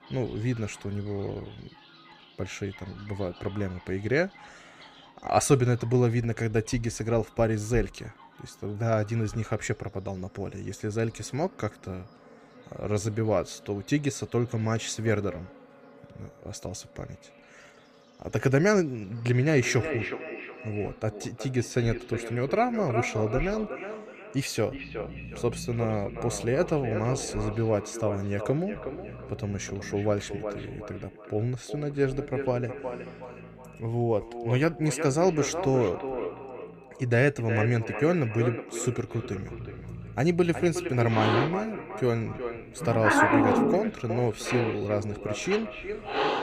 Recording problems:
echo of what is said; strong; from 20 s on; 370 ms later, 9 dB below the speech
animal sounds; loud; throughout; 4 dB below the speech

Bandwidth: 15 kHz